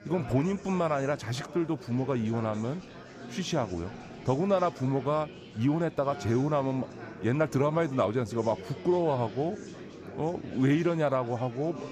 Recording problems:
chatter from many people; noticeable; throughout; 15 dB below the speech

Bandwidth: 15 kHz